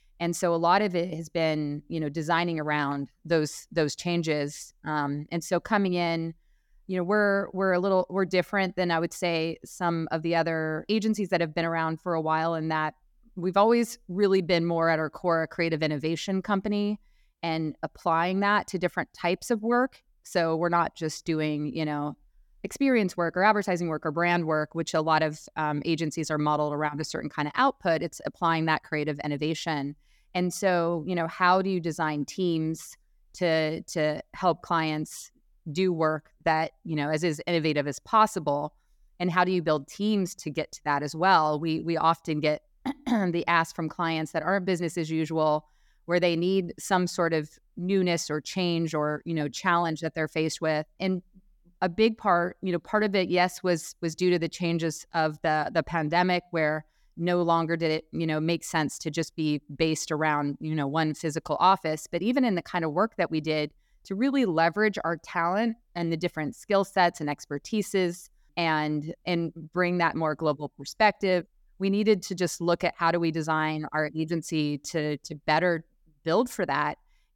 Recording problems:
none

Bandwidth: 18 kHz